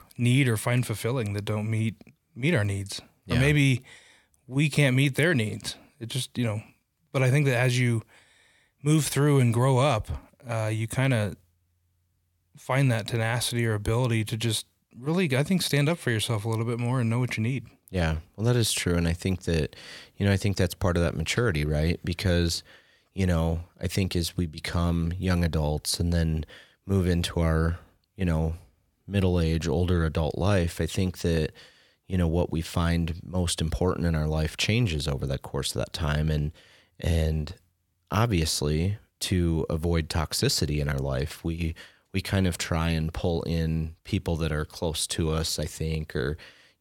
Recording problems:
none

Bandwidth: 17 kHz